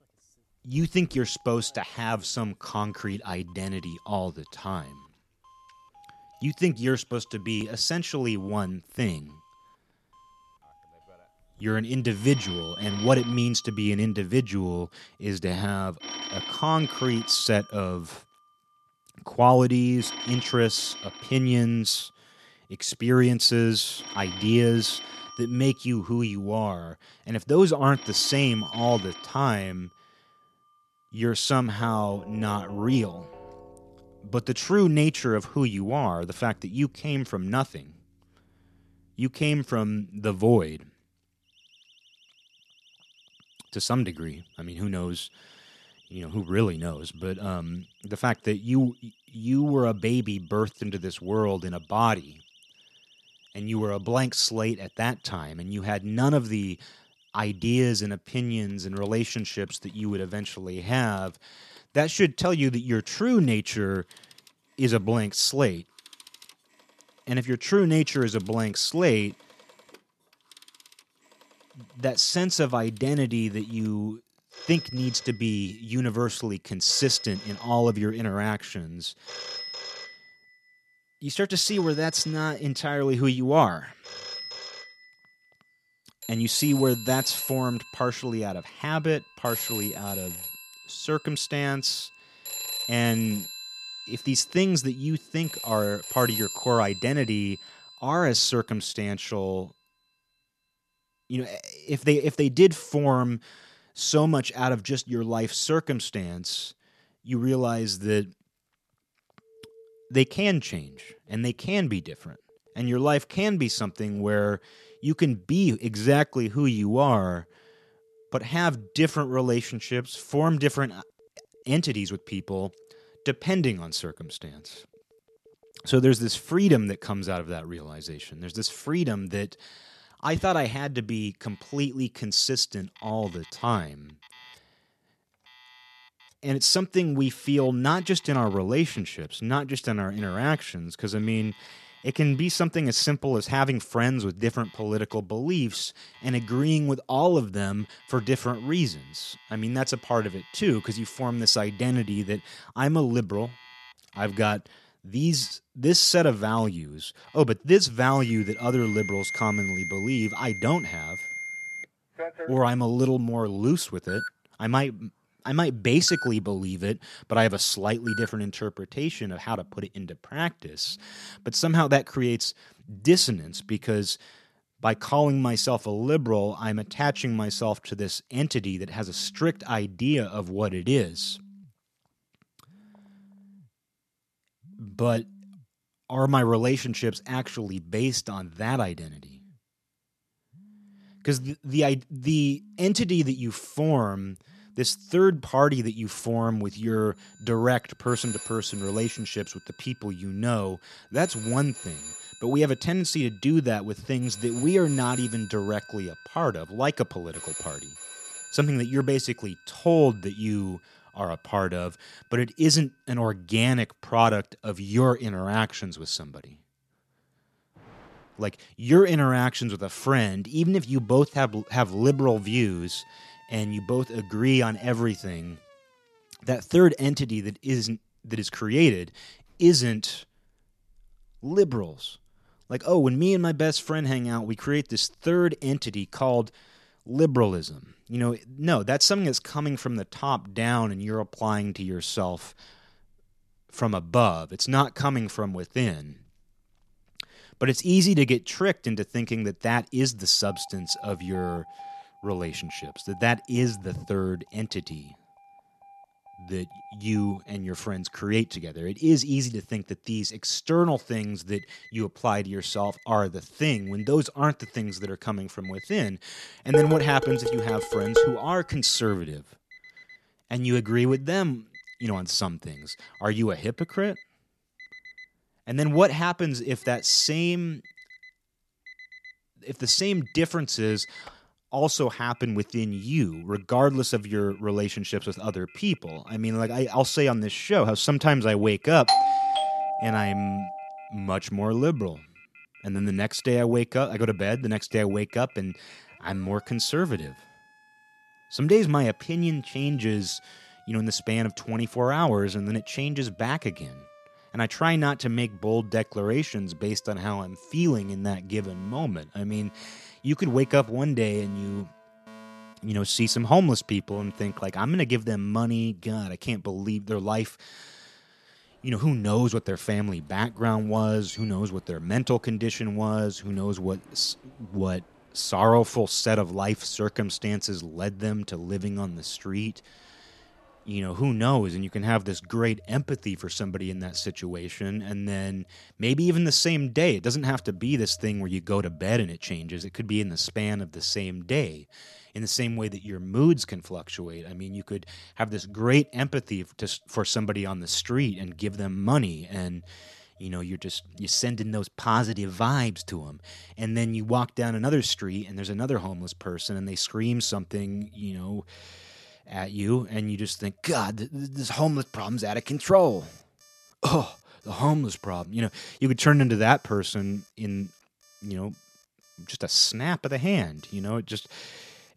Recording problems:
alarms or sirens; noticeable; throughout; 15 dB below the speech
clattering dishes; loud; from 4:27 to 4:28; peak 4 dB above the speech
doorbell; loud; from 4:49 to 4:51; peak 6 dB above the speech

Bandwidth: 13.5 kHz